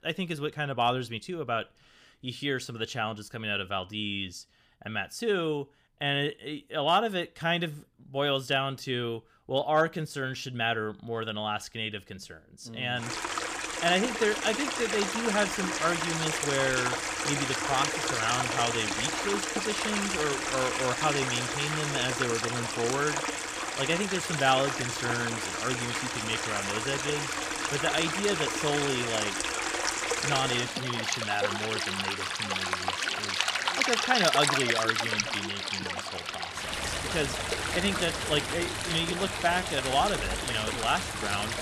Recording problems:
rain or running water; very loud; from 13 s on; 1 dB above the speech

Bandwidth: 15 kHz